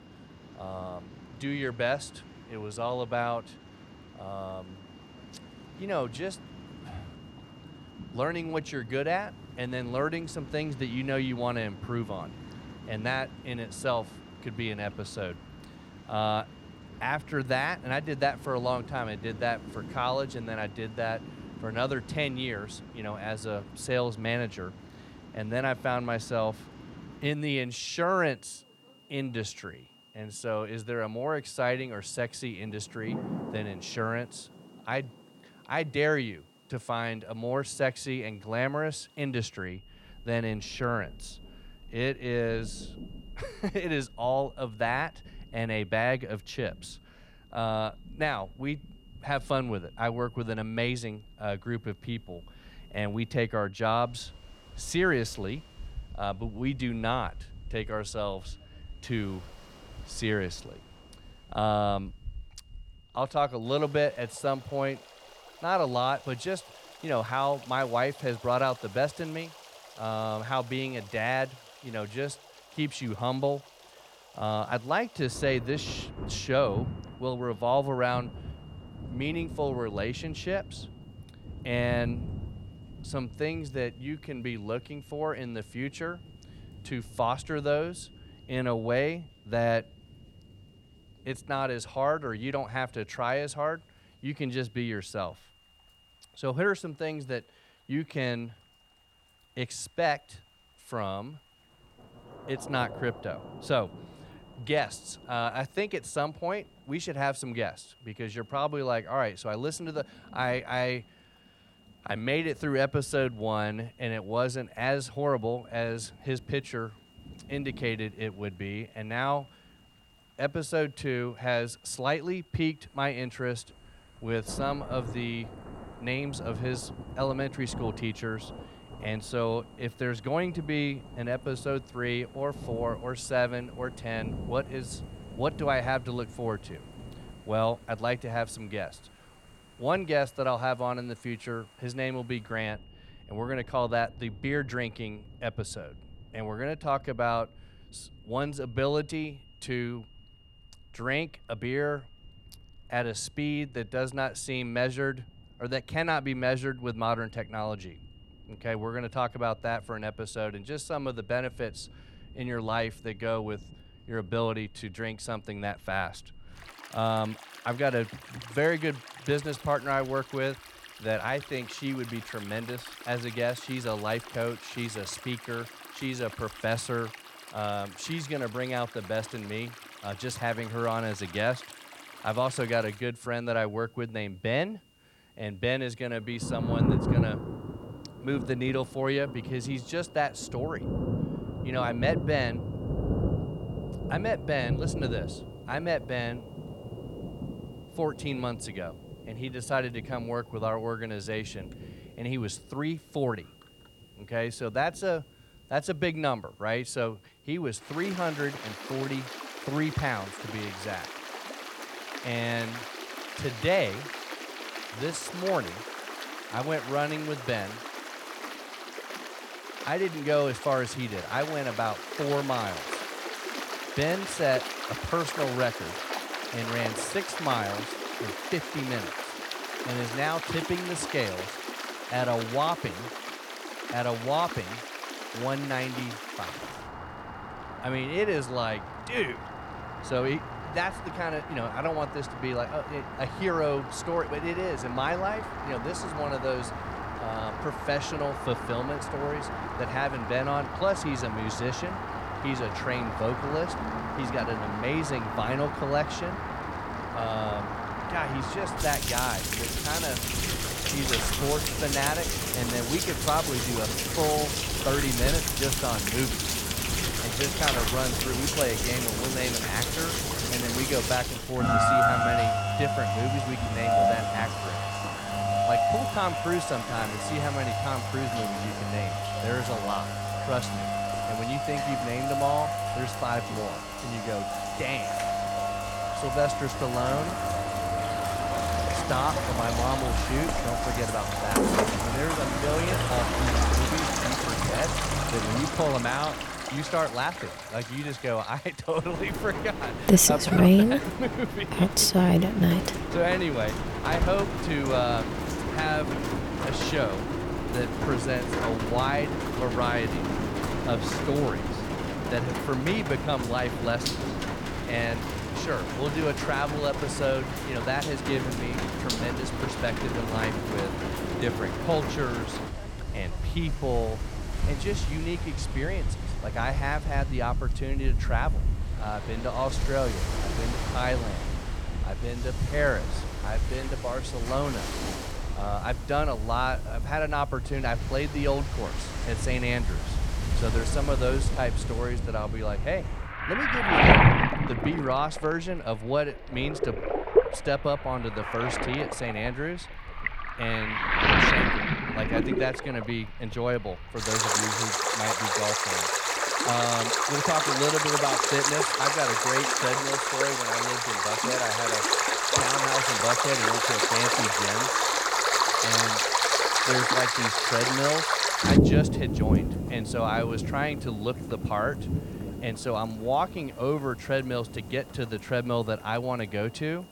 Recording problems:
rain or running water; very loud; throughout; 2 dB above the speech
high-pitched whine; faint; throughout; 3 kHz, 30 dB below the speech

